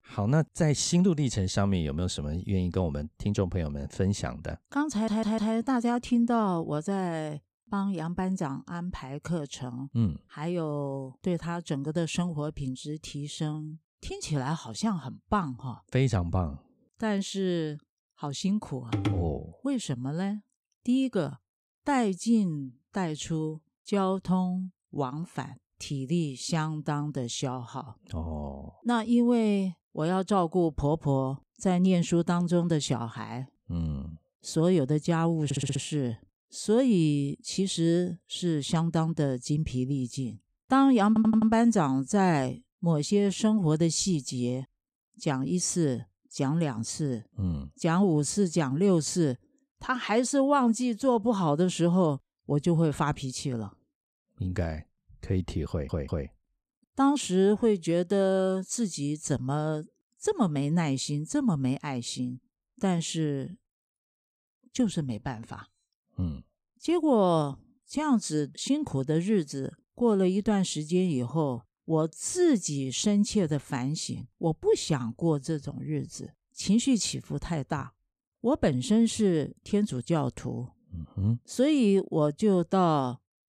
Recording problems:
audio stuttering; 4 times, first at 5 s

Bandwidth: 14.5 kHz